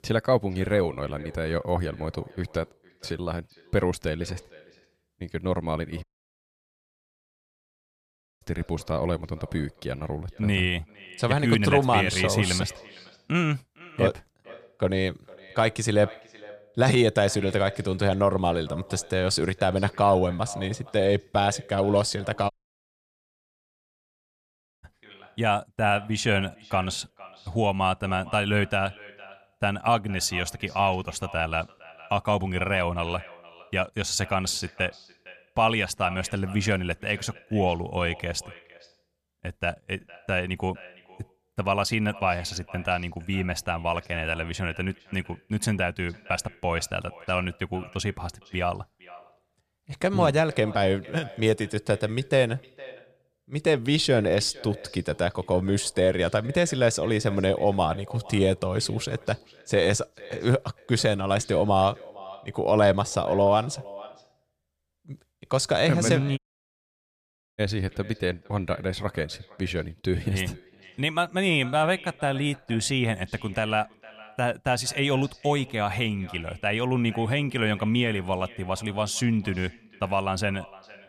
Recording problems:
echo of what is said; faint; throughout; 460 ms later, 20 dB below the speech
audio cutting out; at 6 s for 2.5 s, at 23 s for 2.5 s and at 1:06 for 1 s

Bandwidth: 14.5 kHz